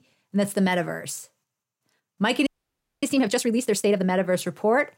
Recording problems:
audio freezing; at 2.5 s for 0.5 s

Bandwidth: 16 kHz